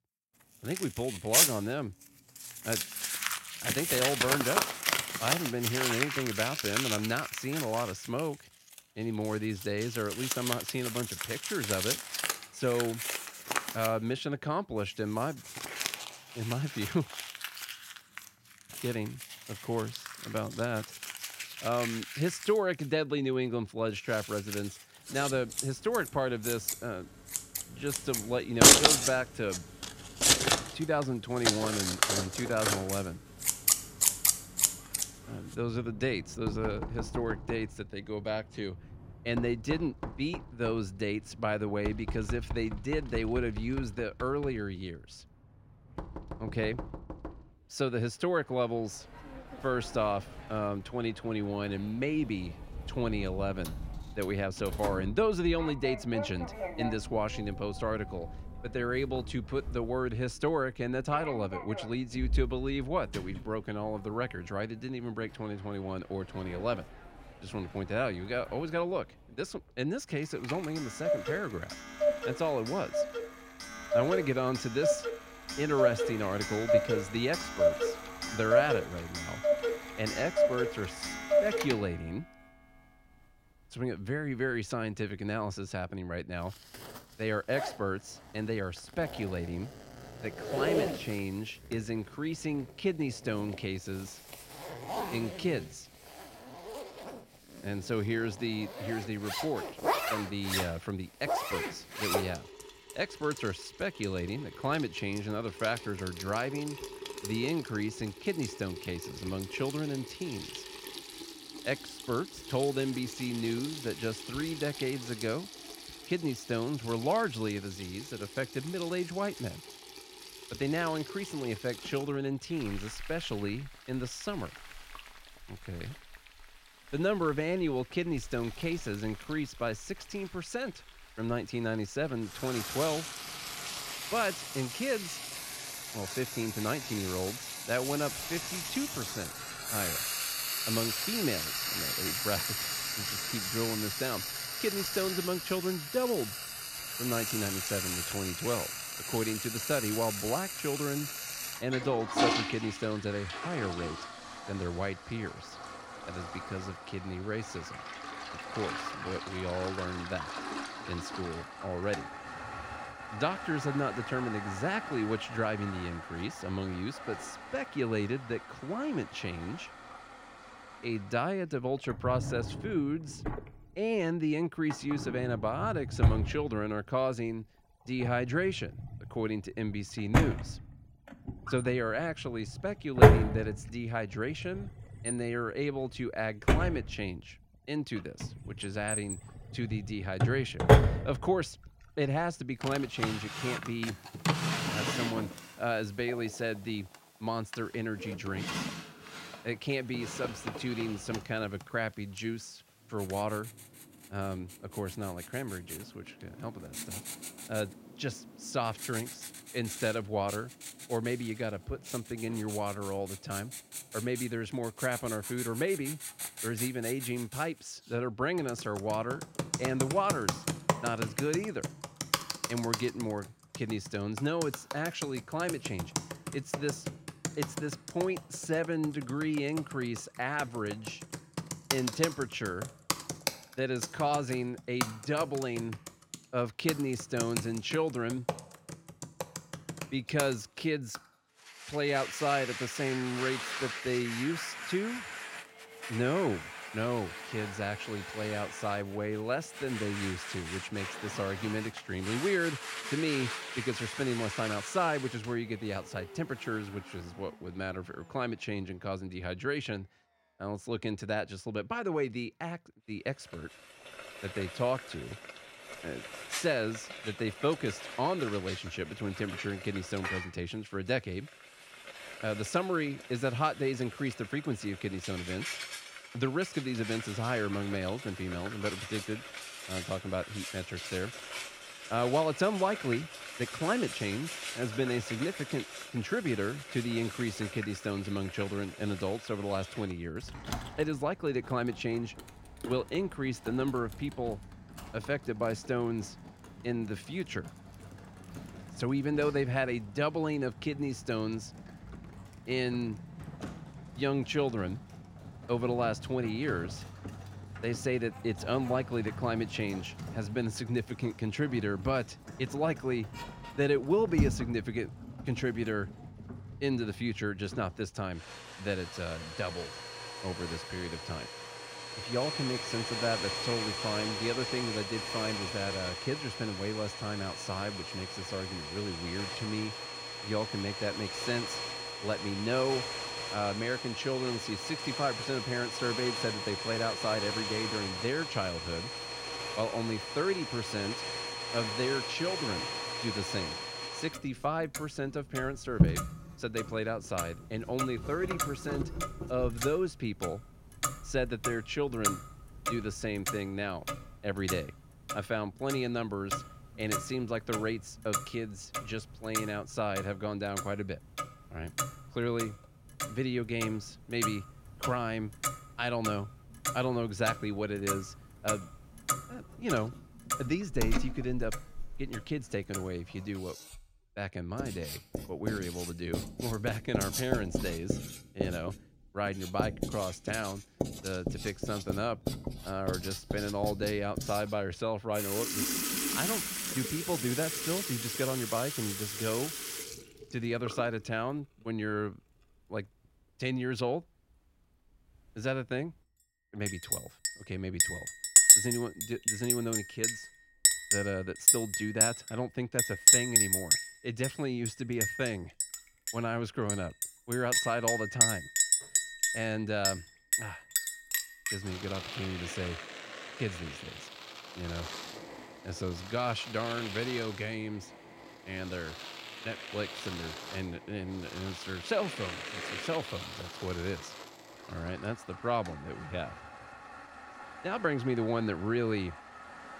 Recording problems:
household noises; very loud; throughout; 1 dB above the speech

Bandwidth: 16 kHz